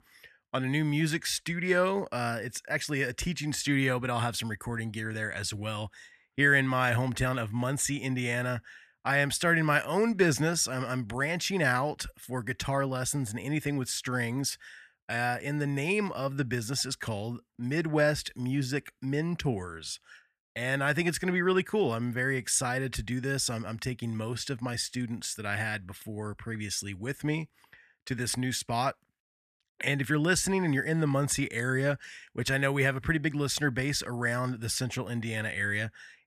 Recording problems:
none

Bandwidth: 14.5 kHz